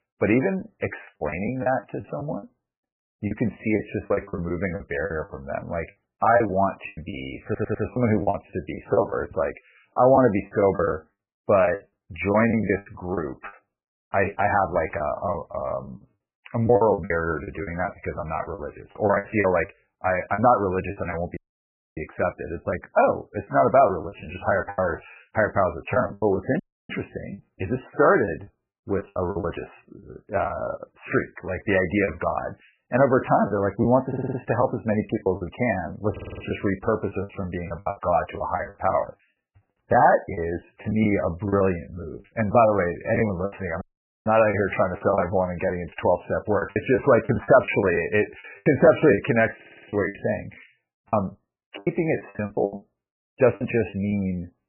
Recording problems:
garbled, watery; badly; nothing above 2.5 kHz
choppy; very; 12% of the speech affected
audio stuttering; 4 times, first at 7.5 s
audio cutting out; at 21 s for 0.5 s, at 27 s and at 44 s

